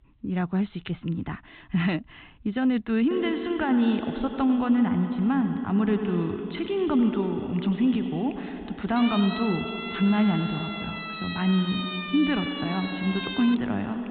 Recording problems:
echo of what is said; strong; from 3 s on; 100 ms later, 6 dB below the speech
high frequencies cut off; severe; nothing above 4 kHz
siren; noticeable; from 9 to 14 s; peak 5 dB below the speech

